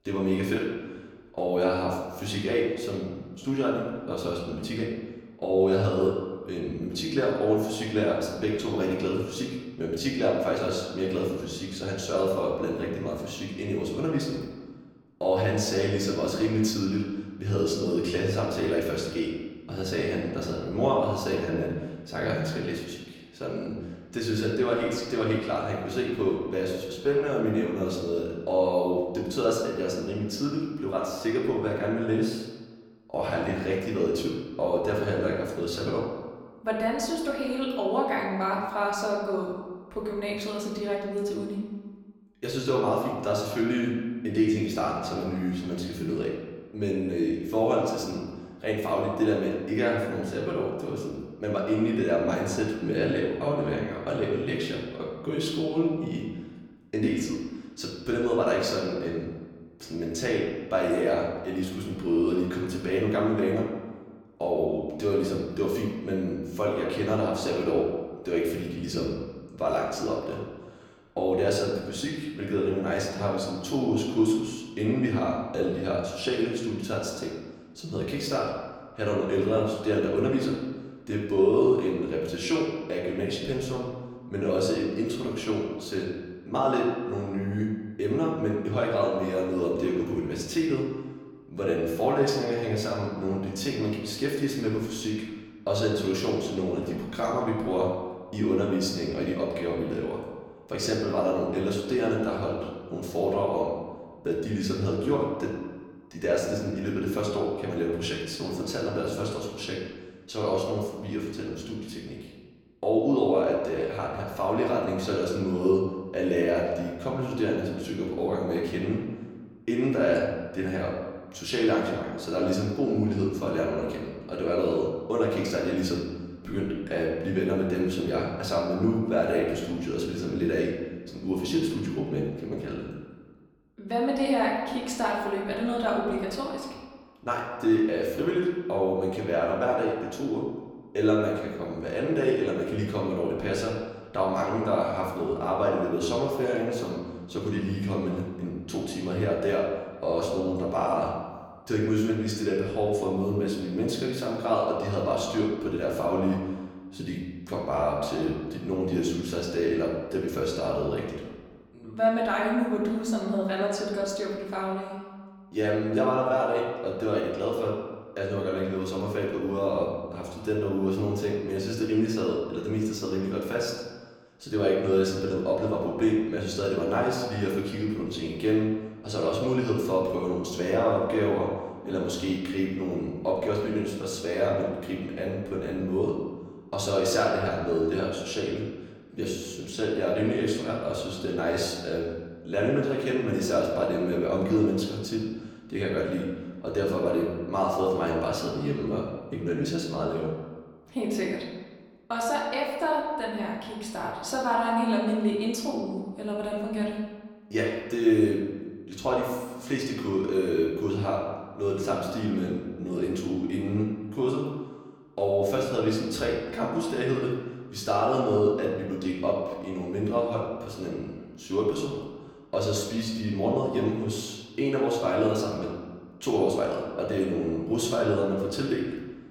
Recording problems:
off-mic speech; far
room echo; noticeable; dies away in 1.2 s

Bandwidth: 17.5 kHz